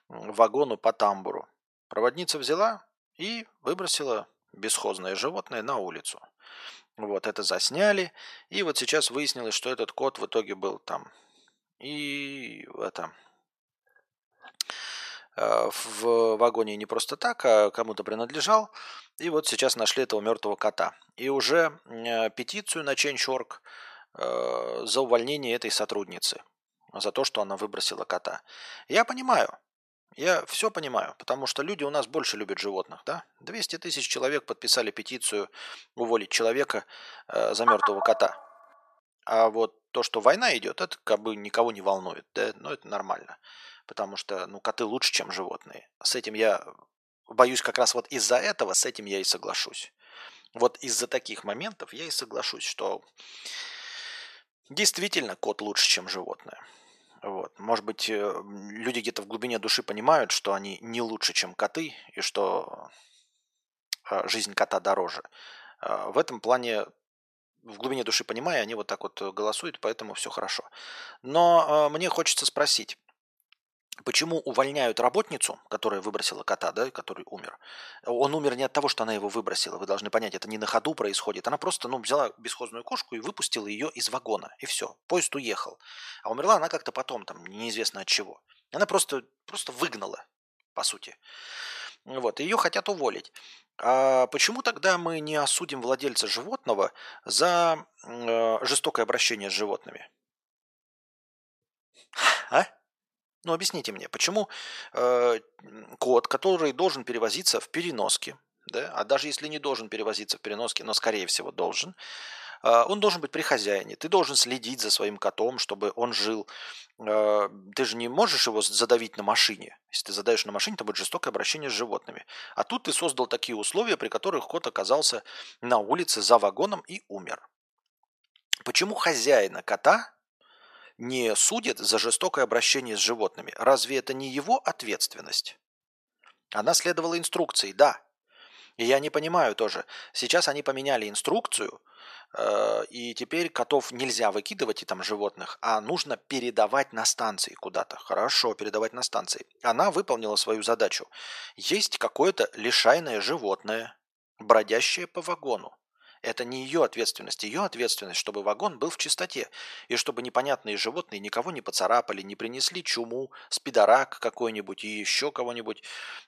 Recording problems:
thin; very; fading below 750 Hz

